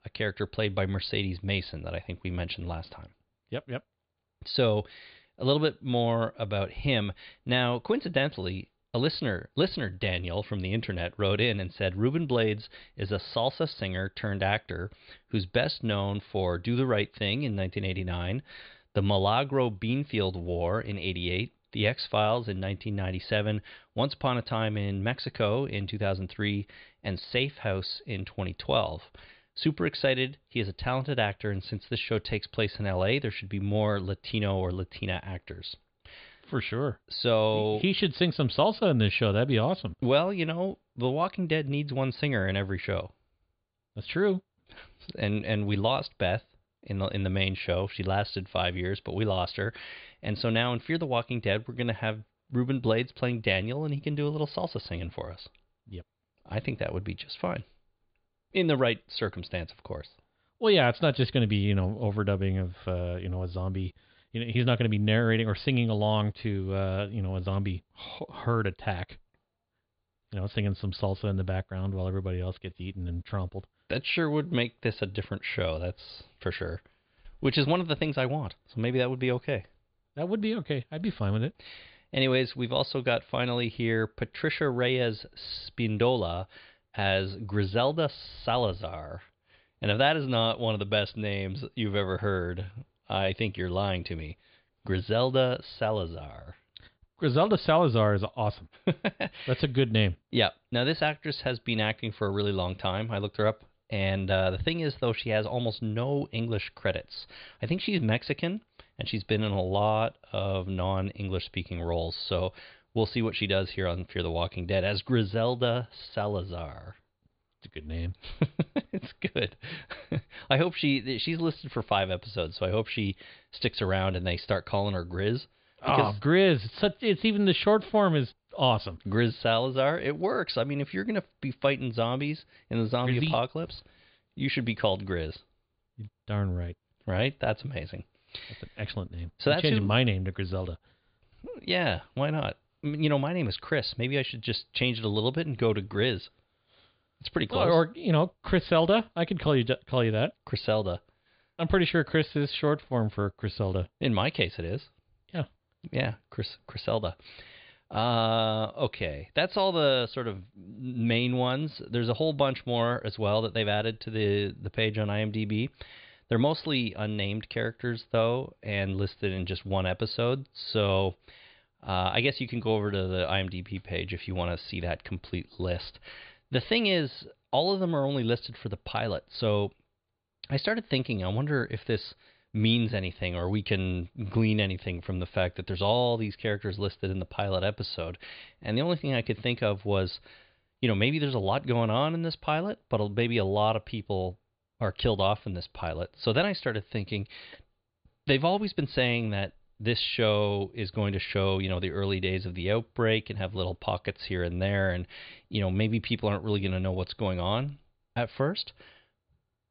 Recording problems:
high frequencies cut off; severe; nothing above 4.5 kHz

